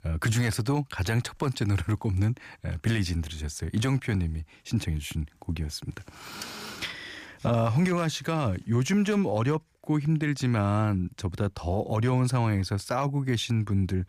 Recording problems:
none

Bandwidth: 15 kHz